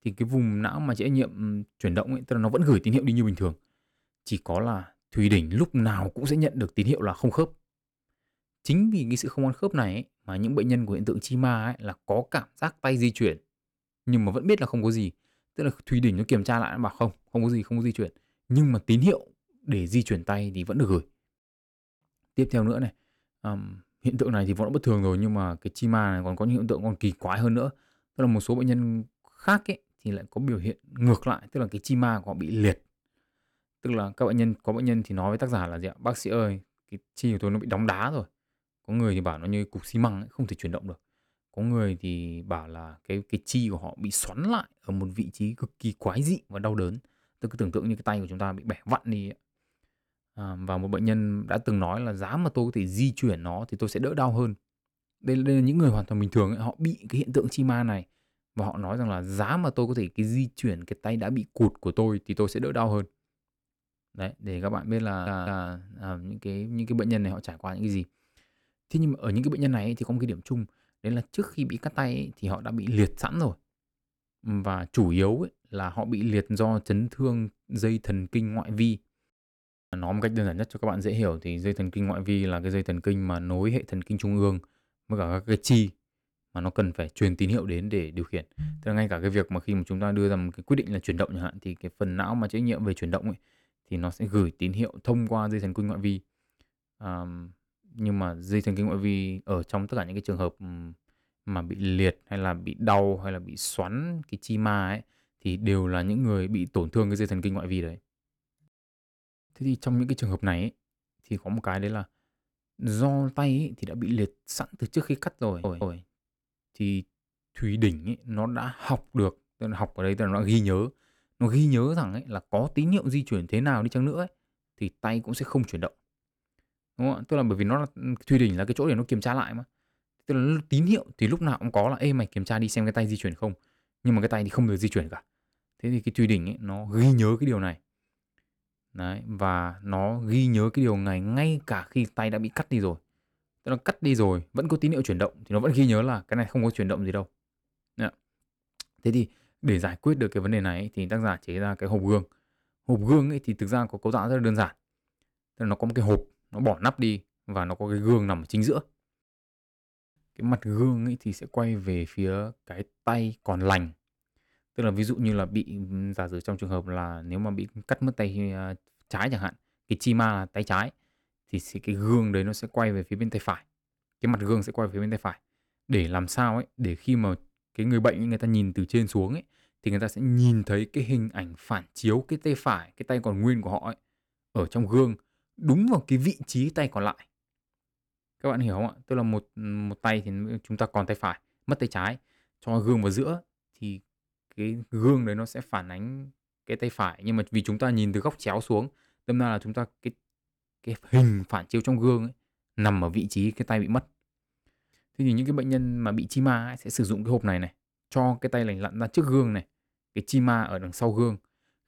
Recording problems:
audio stuttering; at 1:05 and at 1:55

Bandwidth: 18 kHz